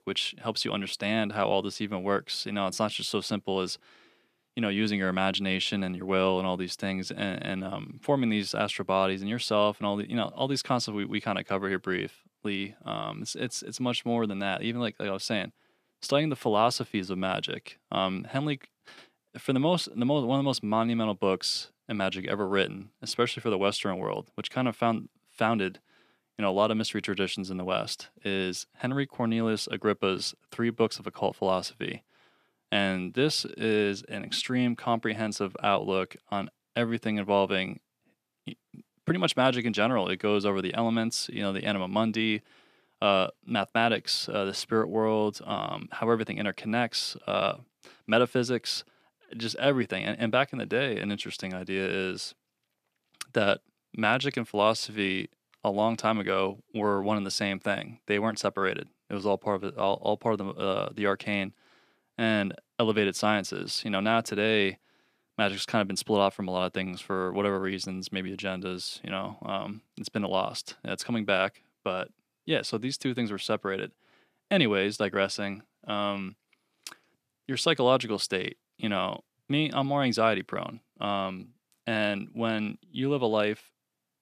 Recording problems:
none

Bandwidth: 14.5 kHz